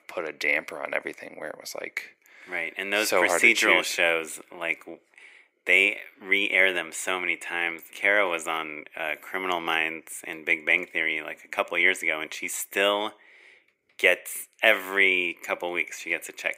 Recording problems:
thin; very; fading below 400 Hz

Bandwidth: 15.5 kHz